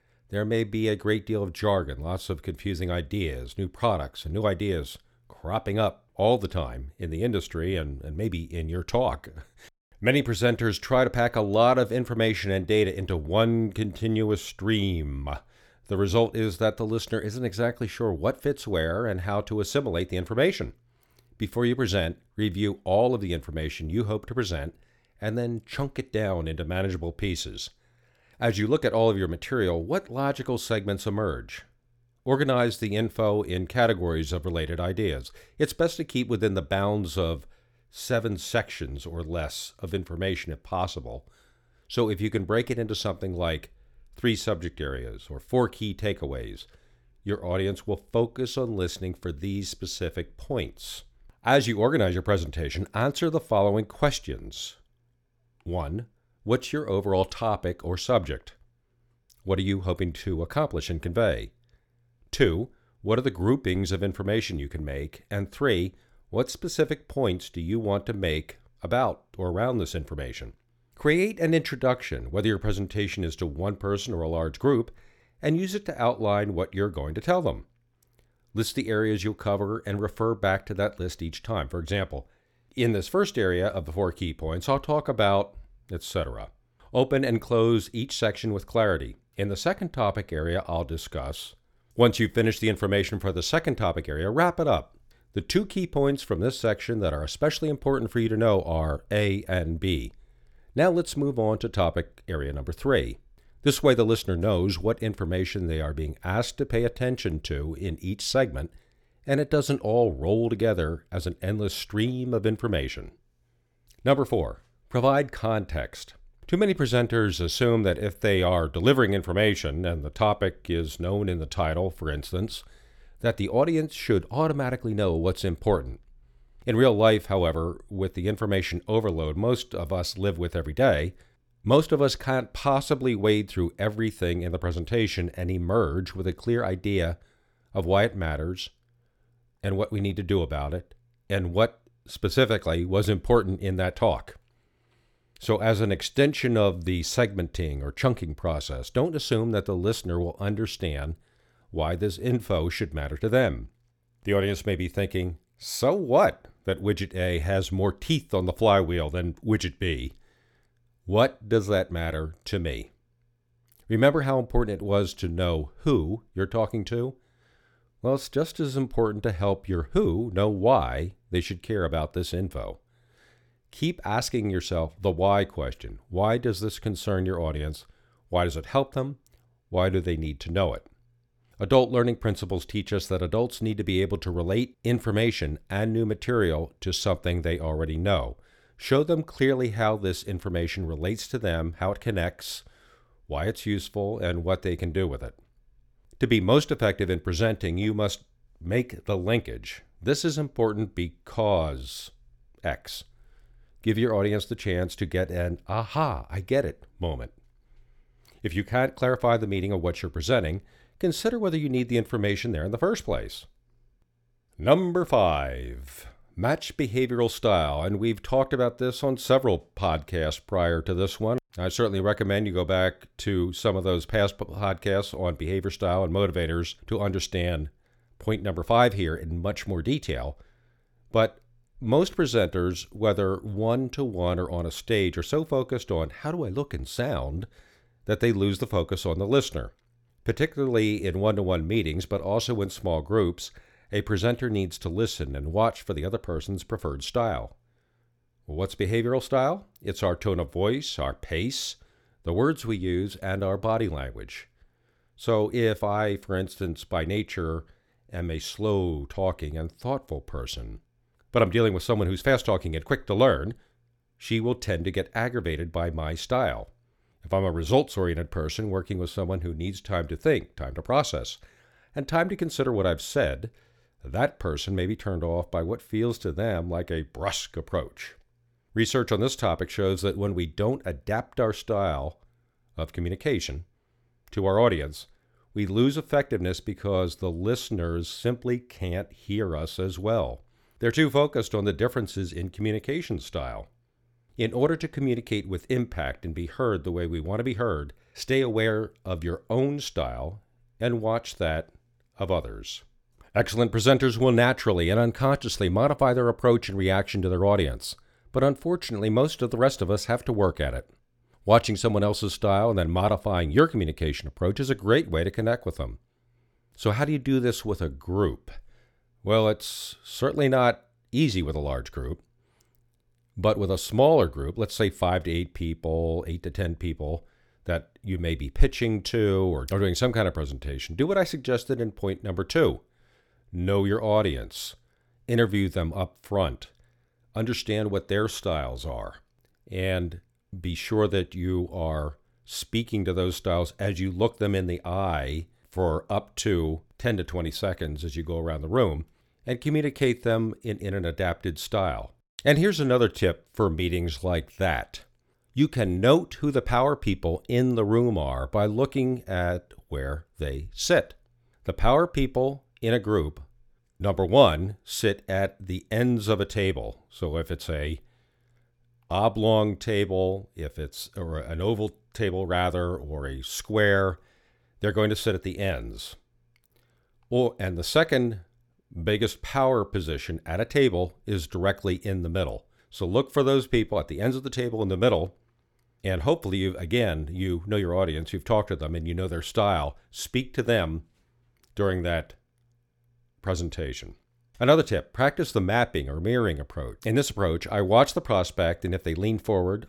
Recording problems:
none

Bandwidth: 17.5 kHz